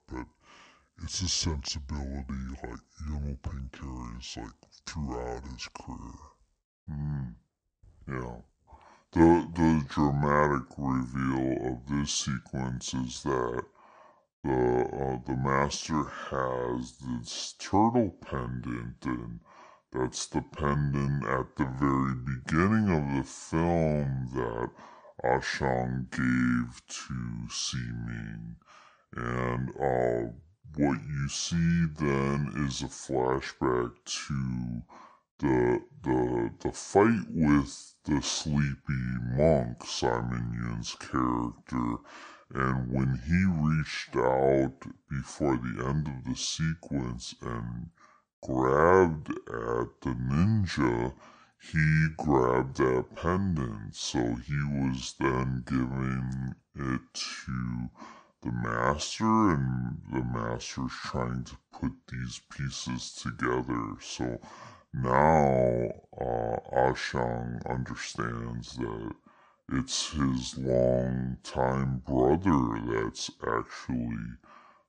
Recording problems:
wrong speed and pitch; too slow and too low; 0.6 times normal speed

